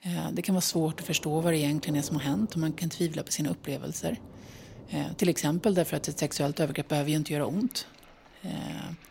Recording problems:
rain or running water; noticeable; throughout; 20 dB below the speech

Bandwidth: 16 kHz